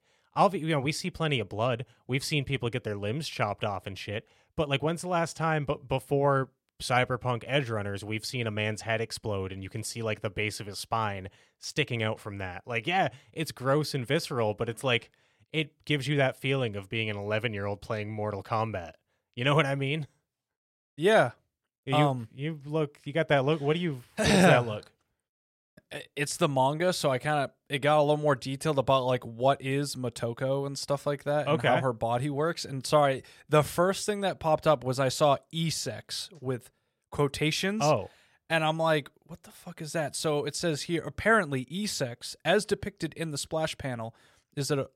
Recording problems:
none

